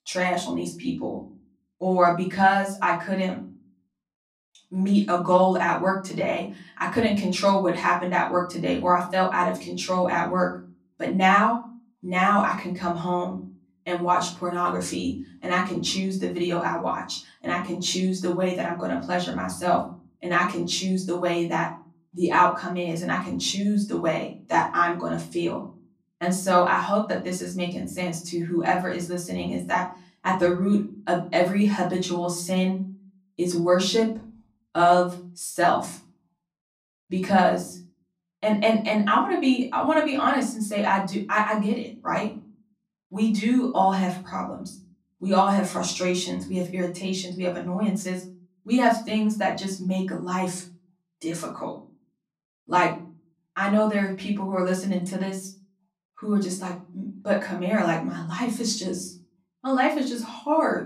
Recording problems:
off-mic speech; far
room echo; slight; dies away in 0.4 s

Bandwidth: 14.5 kHz